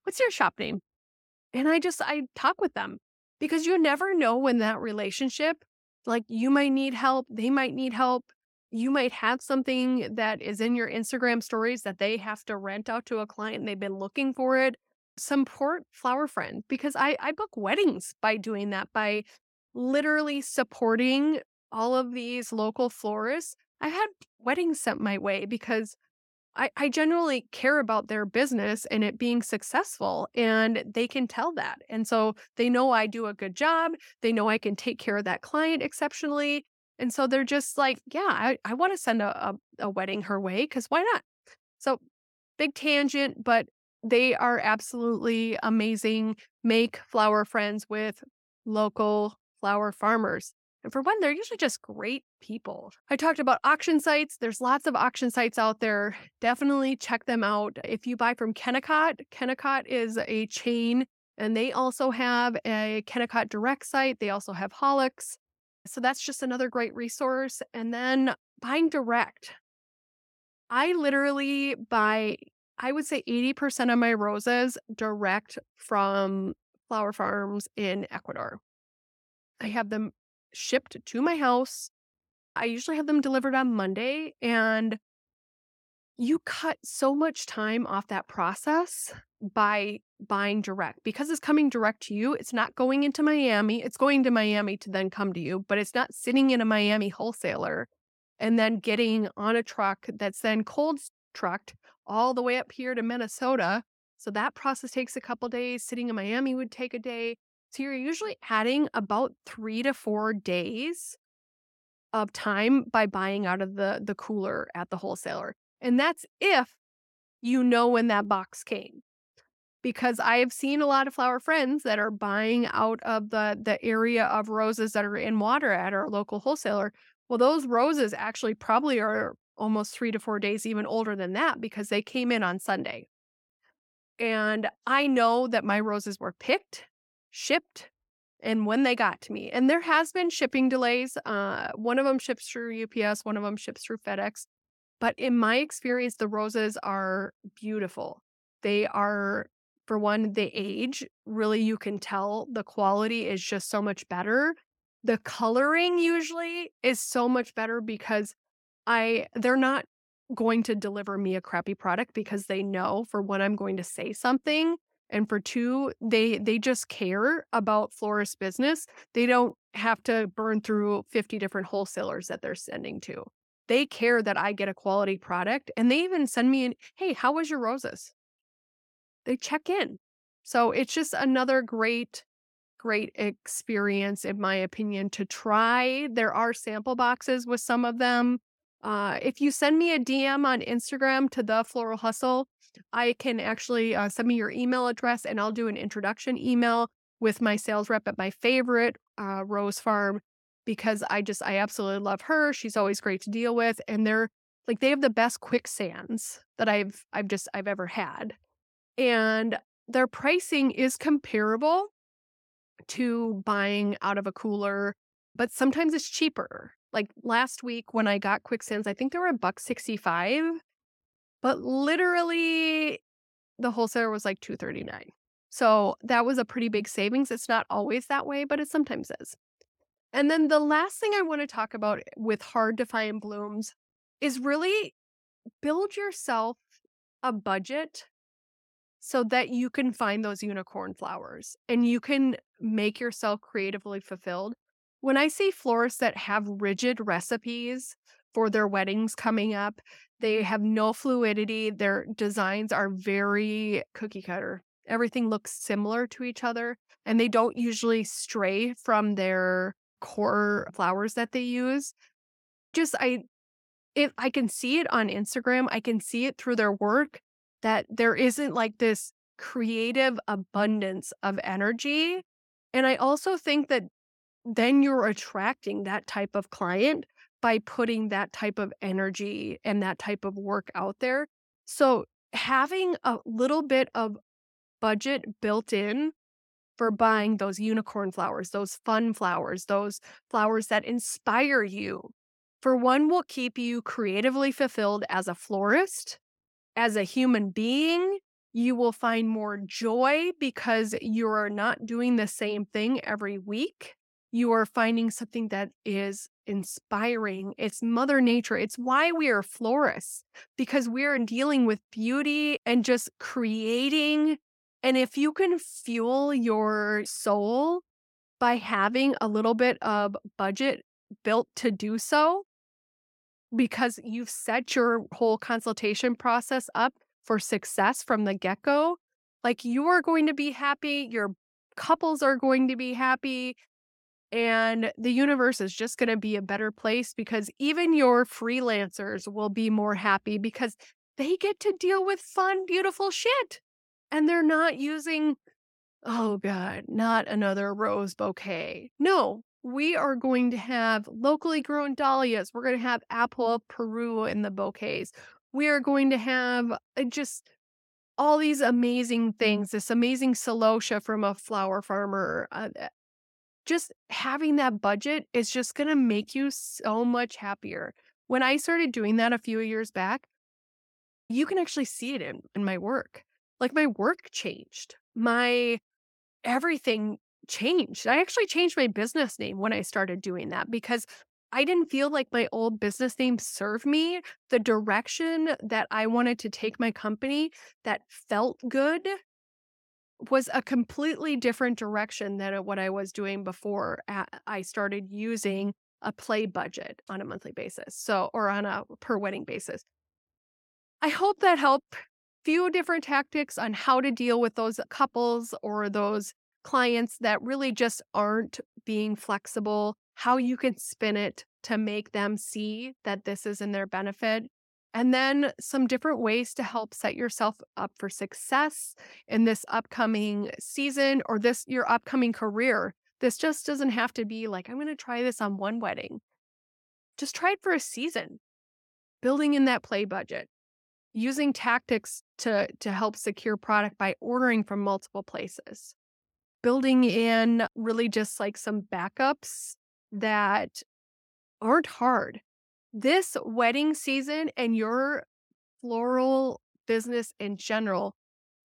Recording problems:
none

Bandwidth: 17 kHz